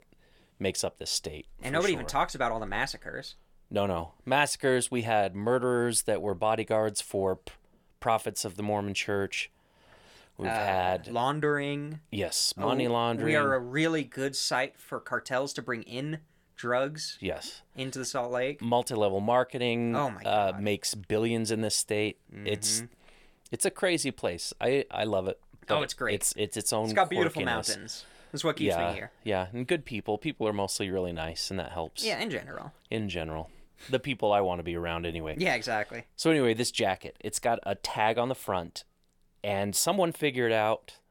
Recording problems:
none

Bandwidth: 17.5 kHz